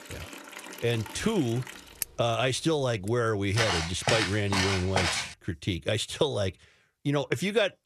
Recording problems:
household noises; noticeable; until 3 s; 10 dB below the speech
footsteps; loud; from 3.5 to 5.5 s; peak 2 dB above the speech

